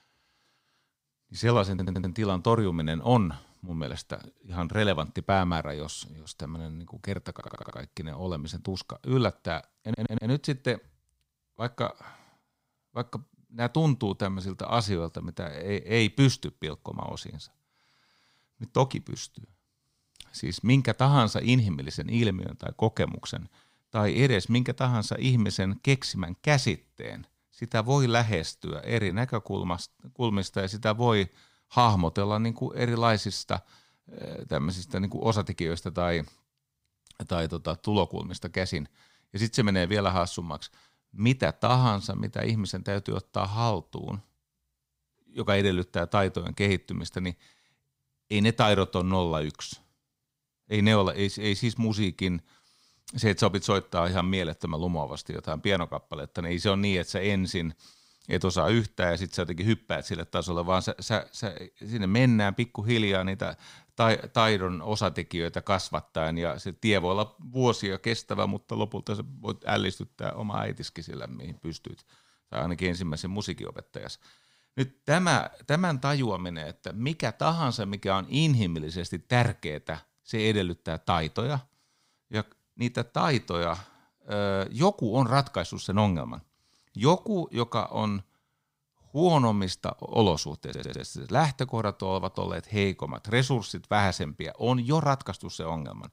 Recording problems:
audio stuttering; 4 times, first at 1.5 s

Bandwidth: 15.5 kHz